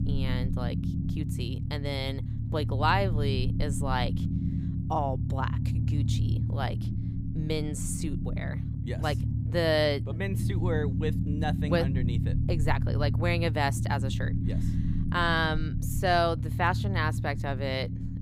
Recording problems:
low rumble; noticeable; throughout; 10 dB below the speech

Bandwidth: 15.5 kHz